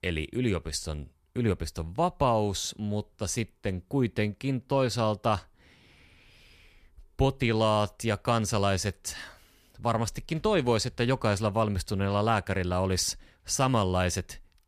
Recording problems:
none

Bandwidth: 14.5 kHz